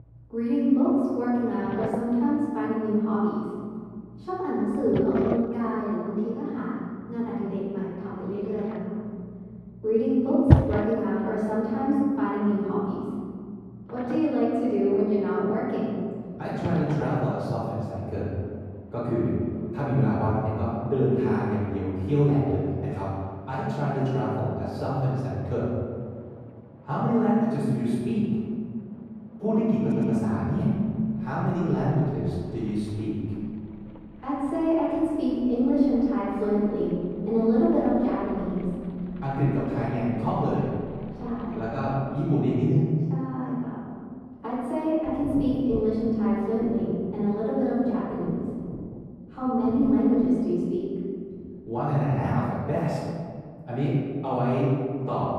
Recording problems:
room echo; strong; dies away in 1.9 s
off-mic speech; far
muffled; very; fading above 1.5 kHz
rain or running water; very faint; throughout; 9 dB below the speech
audio stuttering; at 30 s

